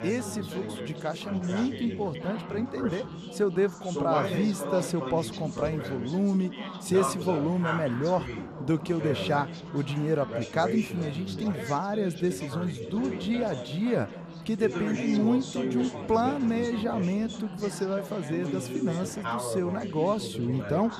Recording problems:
background chatter; loud; throughout; 4 voices, 6 dB below the speech

